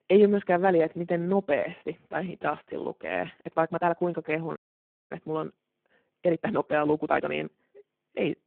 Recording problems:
phone-call audio; poor line
uneven, jittery; strongly; from 1 to 7.5 s
audio cutting out; at 4.5 s for 0.5 s

